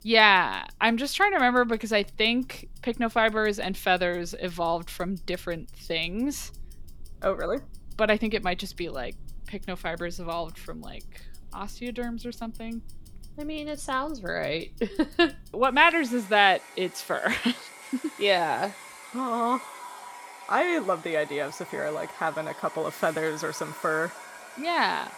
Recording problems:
household noises; noticeable; throughout; 20 dB below the speech

